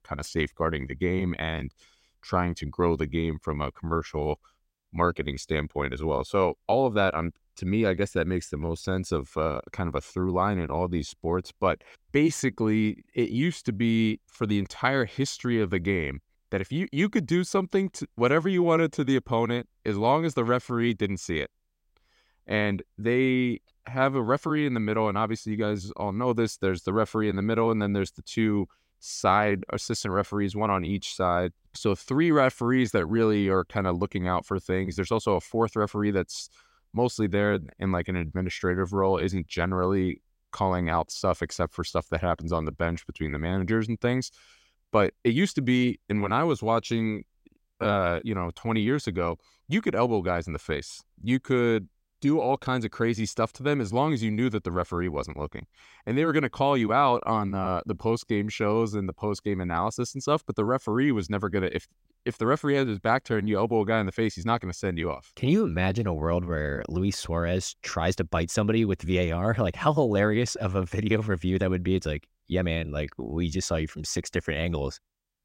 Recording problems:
none

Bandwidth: 16 kHz